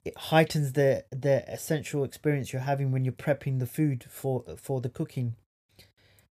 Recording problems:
none

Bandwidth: 14.5 kHz